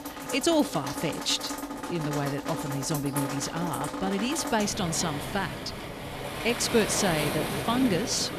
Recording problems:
rain or running water; loud; throughout; 5 dB below the speech

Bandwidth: 14.5 kHz